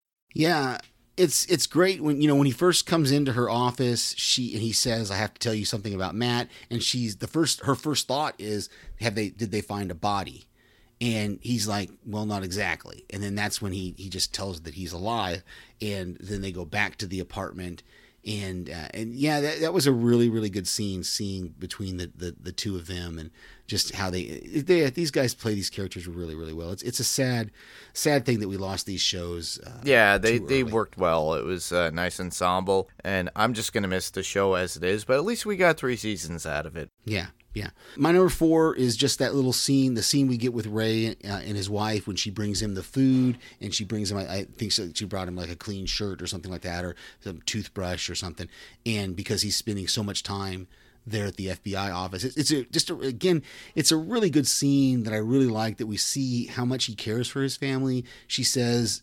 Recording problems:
none

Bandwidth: 17 kHz